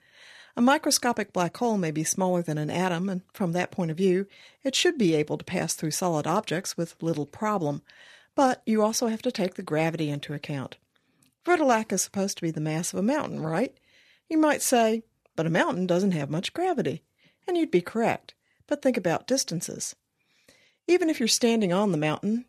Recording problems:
none

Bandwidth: 13.5 kHz